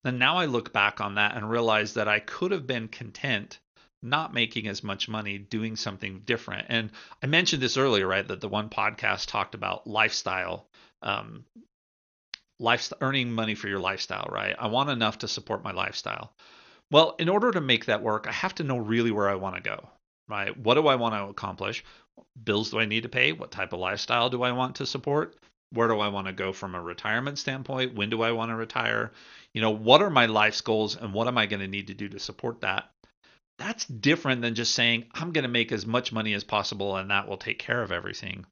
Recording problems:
garbled, watery; slightly; nothing above 6.5 kHz

